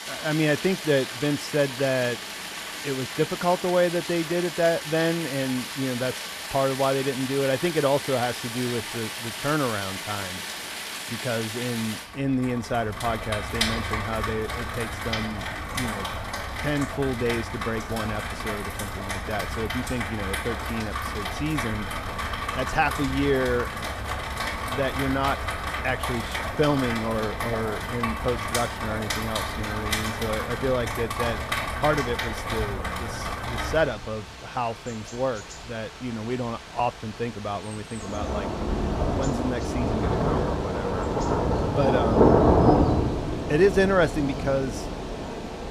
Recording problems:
rain or running water; loud; throughout; 1 dB below the speech

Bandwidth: 14.5 kHz